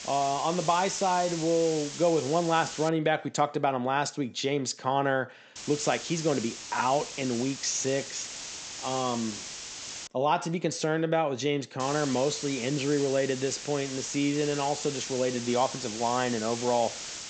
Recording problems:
high frequencies cut off; noticeable; nothing above 8 kHz
hiss; loud; until 3 s, from 5.5 to 10 s and from 12 s on; 9 dB below the speech

